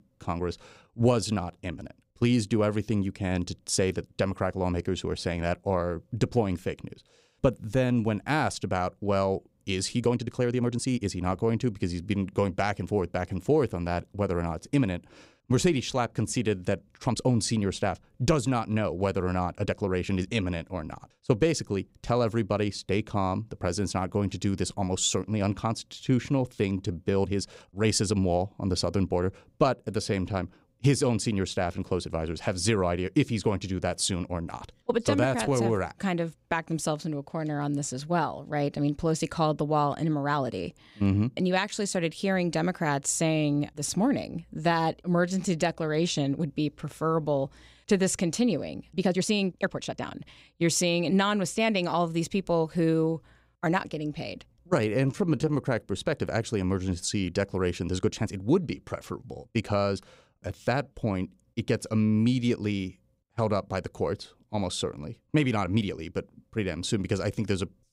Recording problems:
uneven, jittery; strongly; from 0.5 s to 1:06

